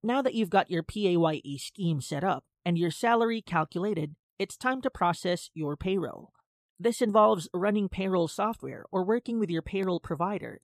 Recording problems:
none

